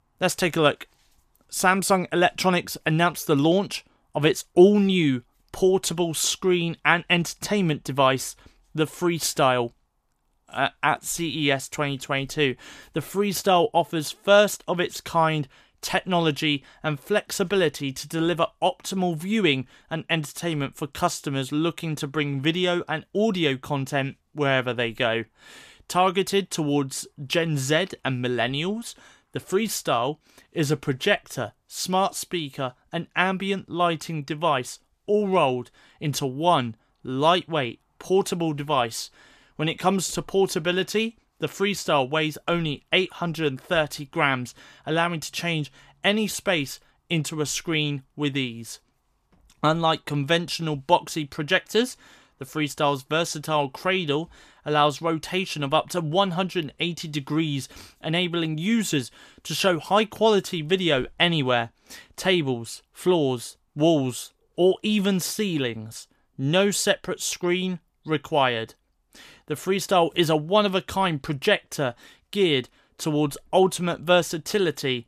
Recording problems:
none

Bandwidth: 14.5 kHz